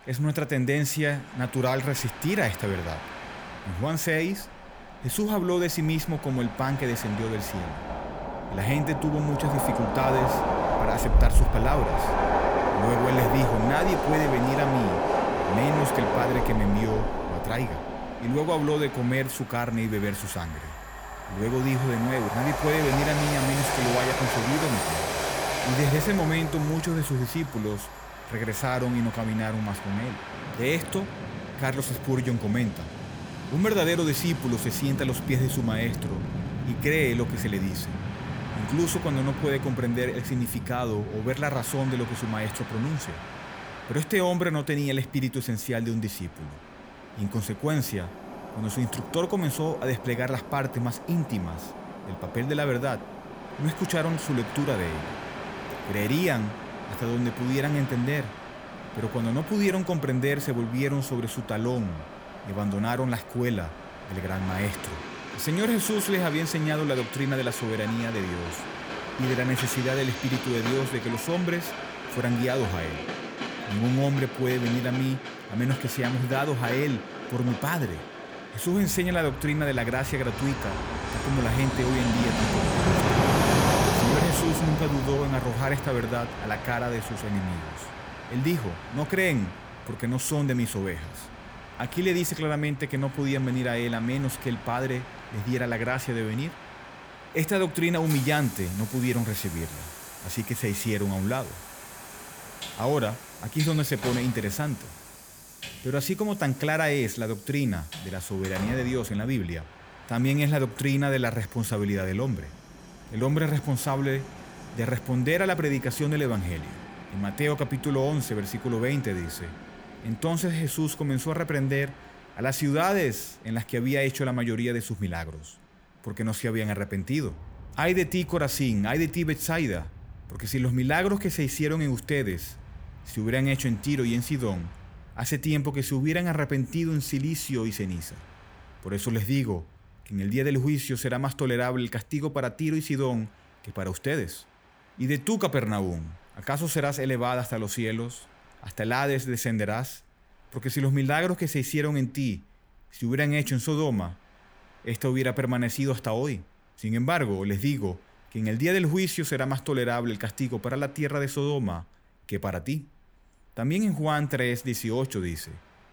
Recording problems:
train or aircraft noise; loud; throughout; 5 dB below the speech

